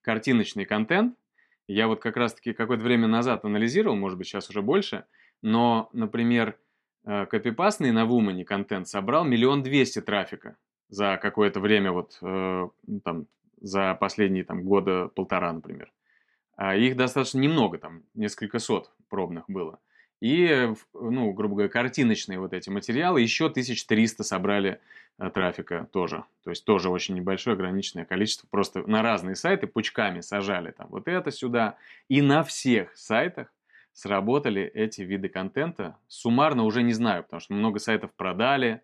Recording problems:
none

